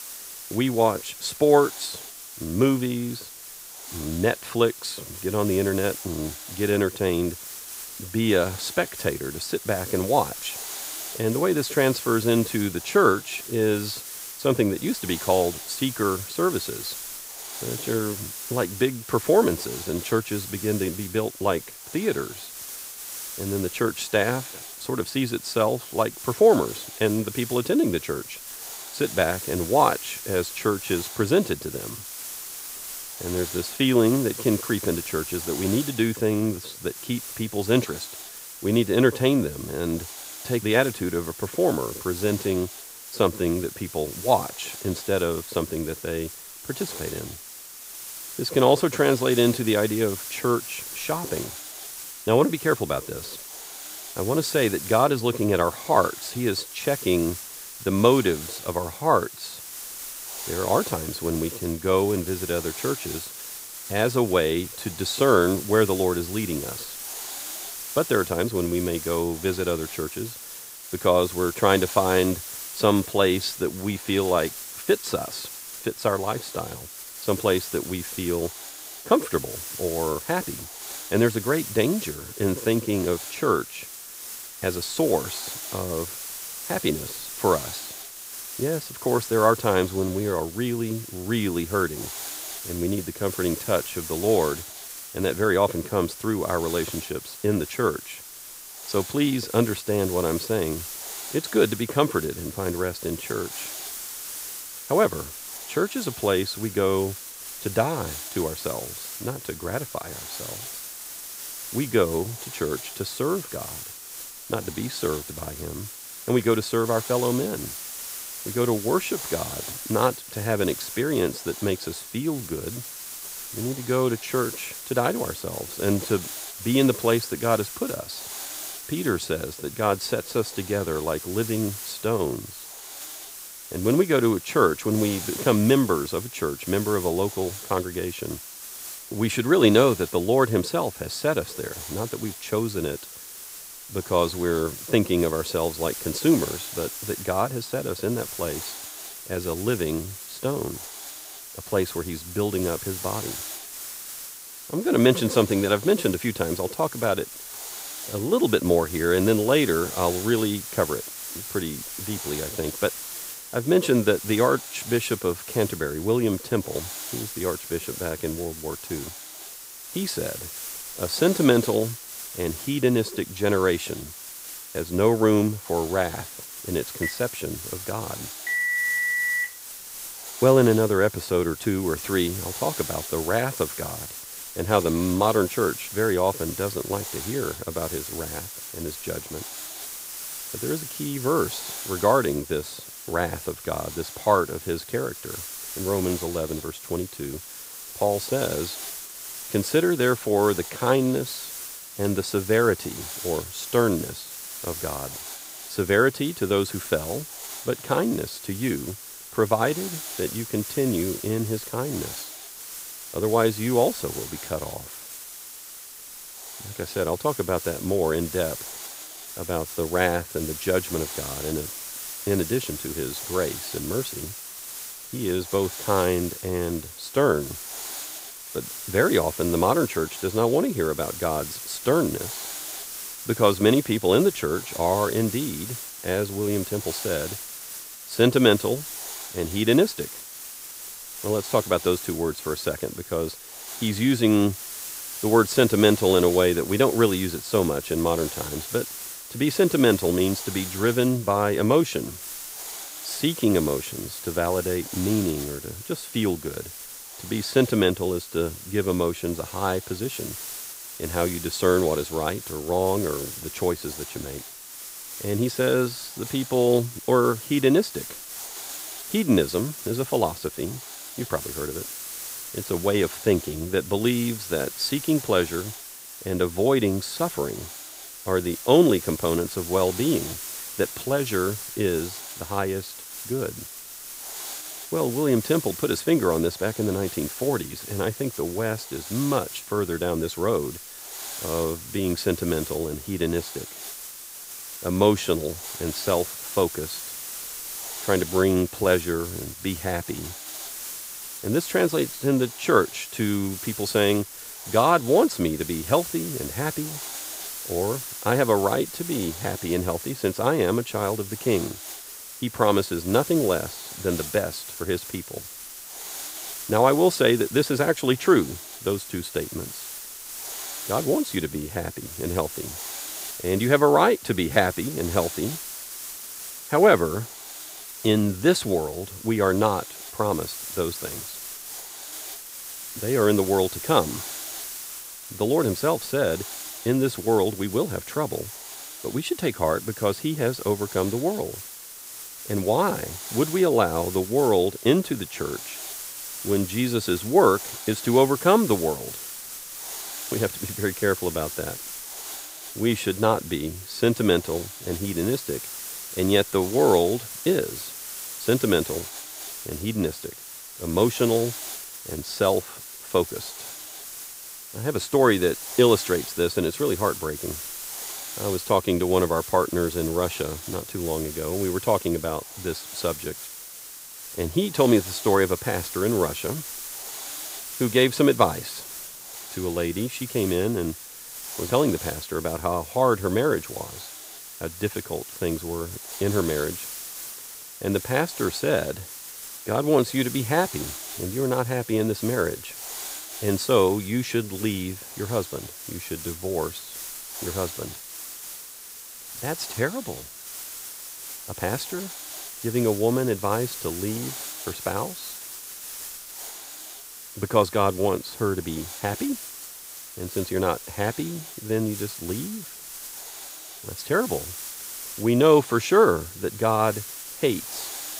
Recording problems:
hiss; loud; throughout; 10 dB below the speech
phone ringing; loud; from 2:57 to 2:59; peak 3 dB above the speech

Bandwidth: 15.5 kHz